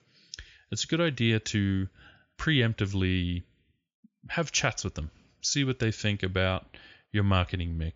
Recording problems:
high frequencies cut off; noticeable; nothing above 7 kHz

